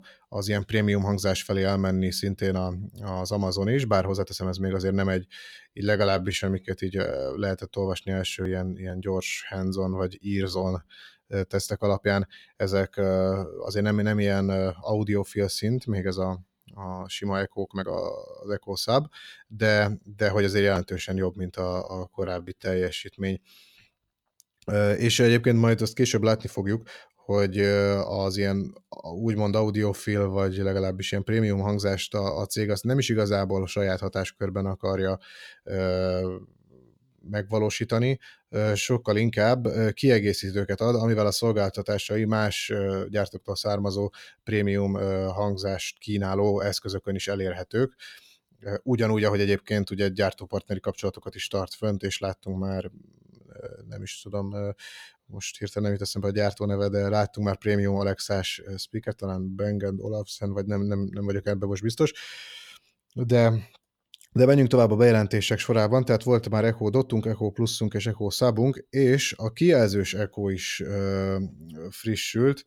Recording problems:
uneven, jittery; strongly; from 5.5 to 54 s

